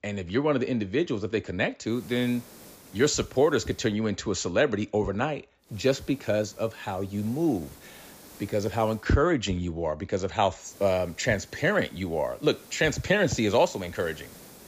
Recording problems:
high frequencies cut off; noticeable; nothing above 7.5 kHz
hiss; faint; from 2 to 4 s, from 5.5 to 9 s and from 11 s on; 25 dB below the speech

